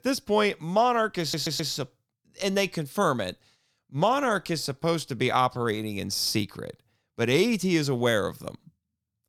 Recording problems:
audio stuttering; at 1 s

